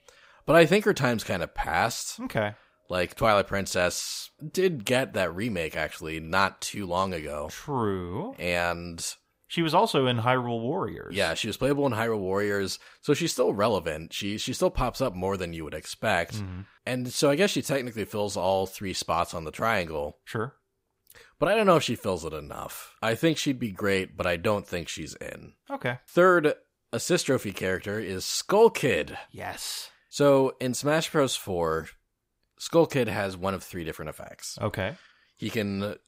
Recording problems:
none

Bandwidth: 15.5 kHz